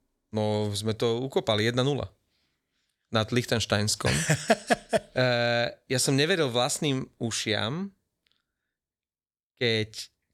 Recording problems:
none

